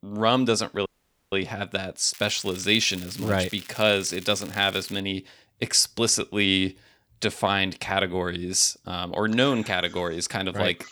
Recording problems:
crackling; noticeable; from 2 to 5 s; 20 dB below the speech
audio cutting out; at 1 s

